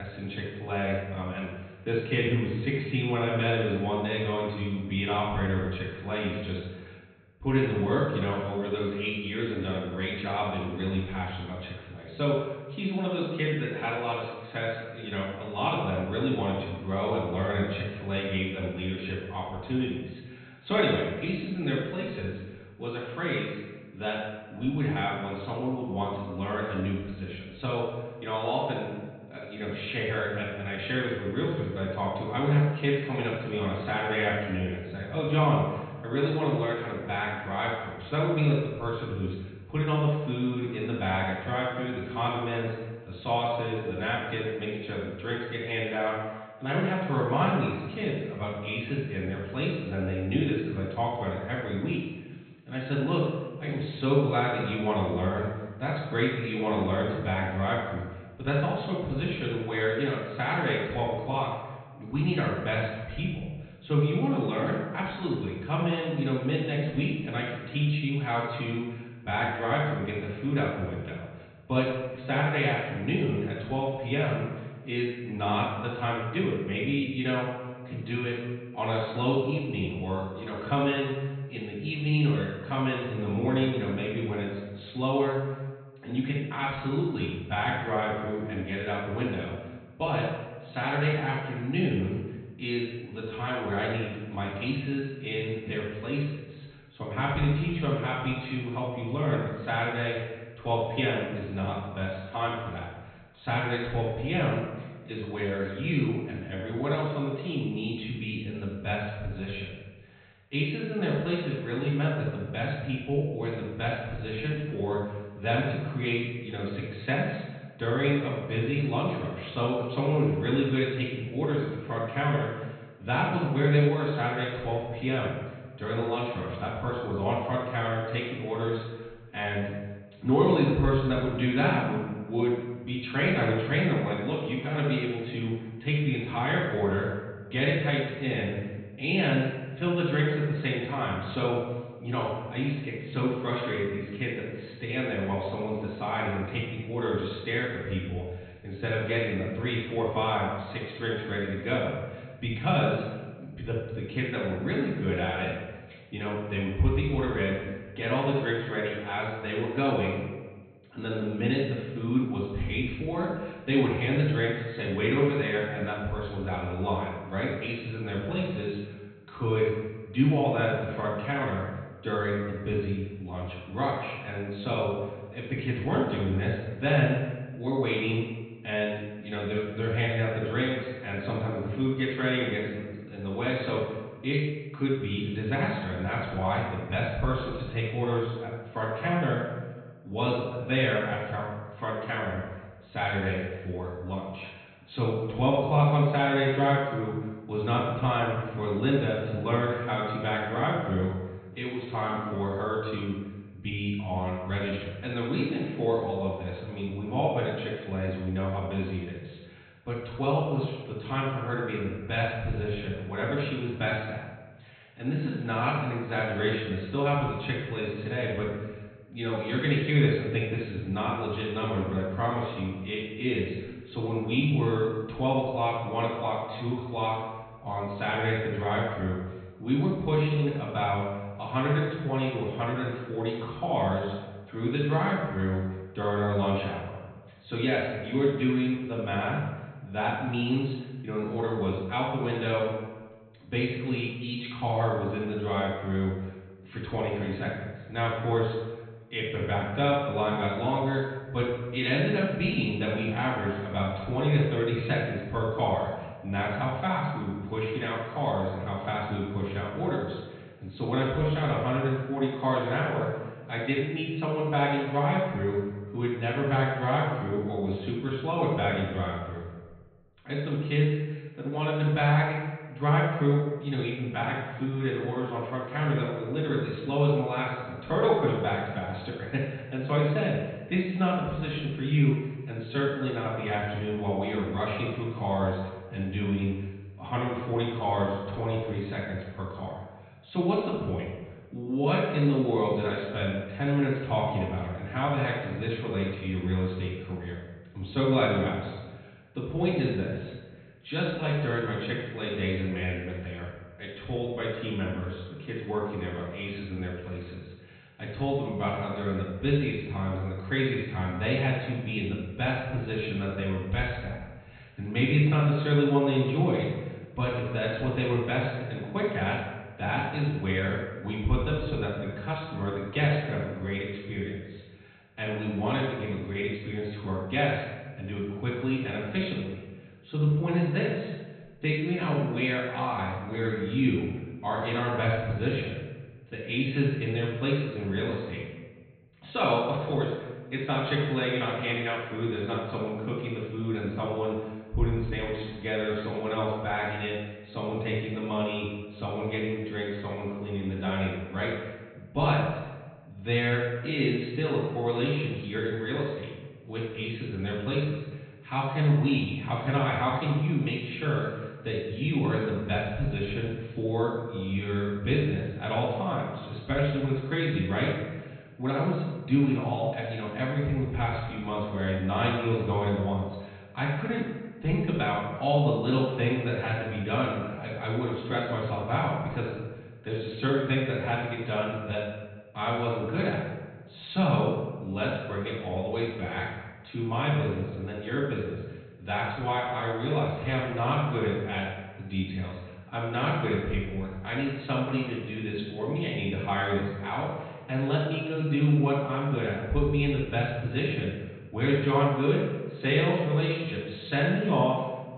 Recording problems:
off-mic speech; far
high frequencies cut off; severe; nothing above 4 kHz
room echo; noticeable; dies away in 1.1 s
muffled; very slightly; fading above 3.5 kHz
abrupt cut into speech; at the start

